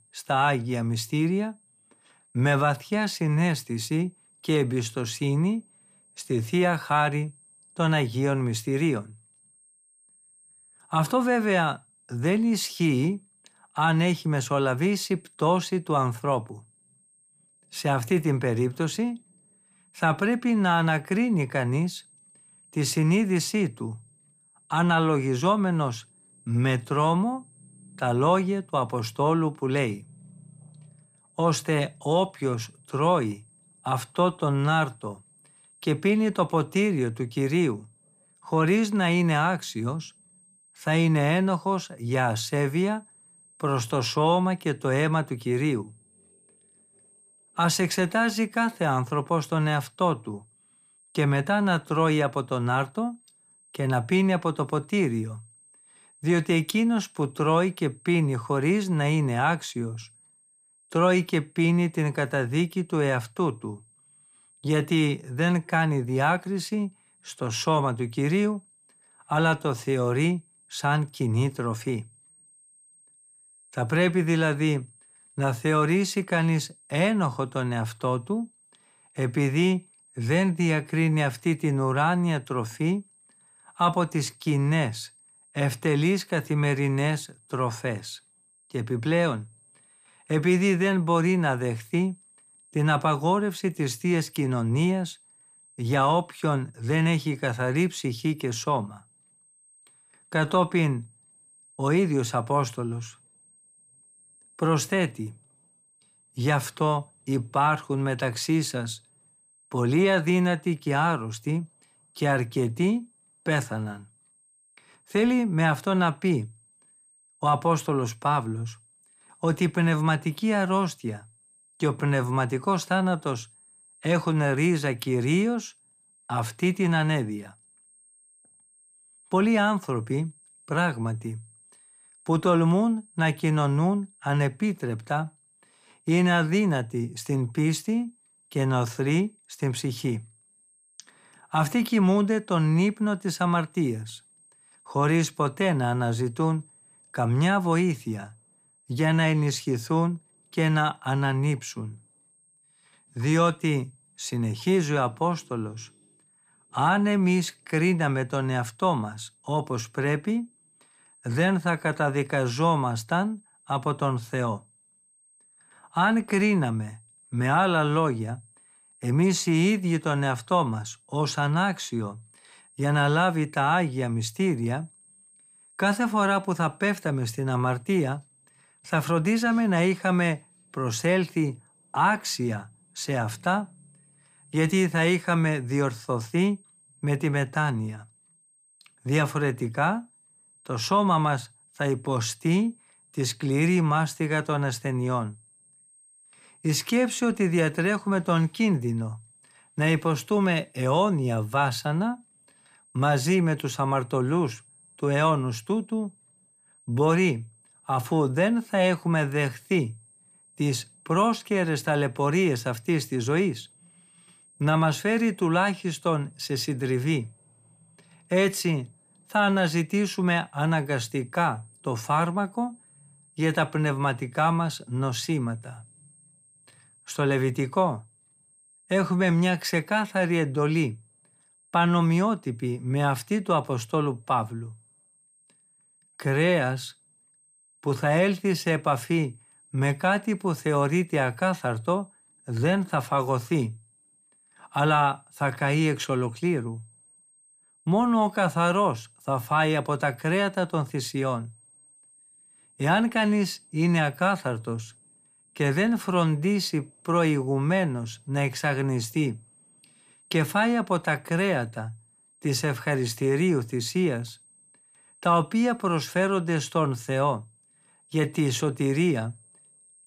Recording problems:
high-pitched whine; faint; throughout; 8.5 kHz, 30 dB below the speech

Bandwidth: 15 kHz